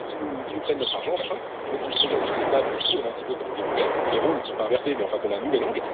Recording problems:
wrong speed, natural pitch; too fast; 1.5 times normal speed
thin; somewhat; fading below 350 Hz
phone-call audio; nothing above 3.5 kHz
animal sounds; very loud; throughout; 2 dB above the speech
wind noise on the microphone; heavy; as loud as the speech

